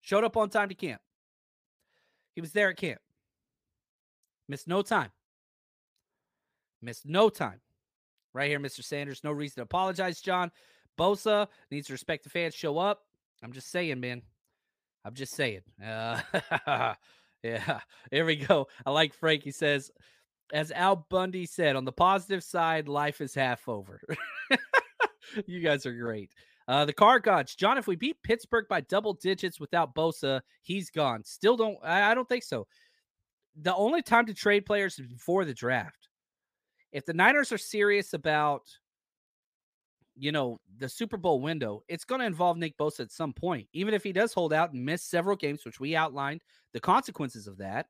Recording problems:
none

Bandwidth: 15 kHz